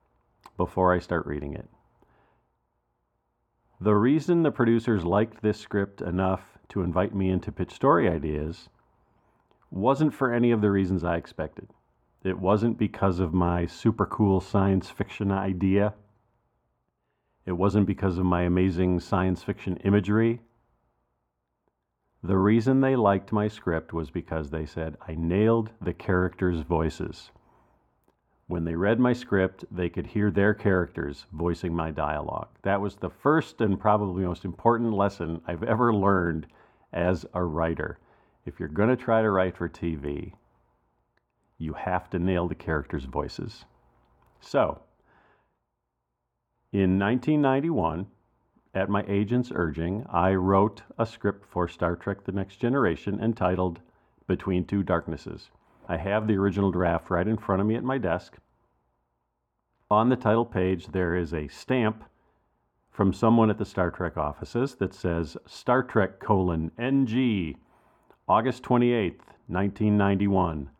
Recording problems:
muffled; very; fading above 2.5 kHz

